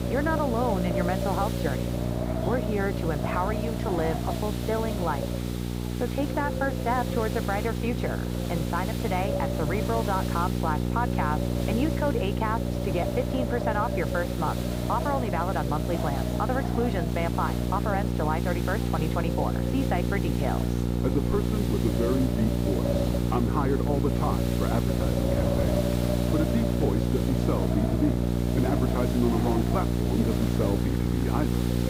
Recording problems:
muffled; very; fading above 2 kHz
wind noise on the microphone; heavy; 6 dB below the speech
electrical hum; loud; throughout; 60 Hz, 5 dB below the speech
chatter from many people; noticeable; throughout; 15 dB below the speech
hiss; noticeable; throughout; 10 dB below the speech

